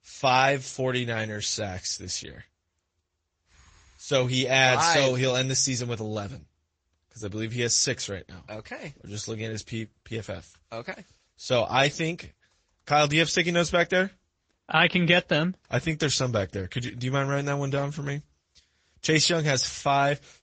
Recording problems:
high frequencies cut off; noticeable; nothing above 7.5 kHz
garbled, watery; slightly

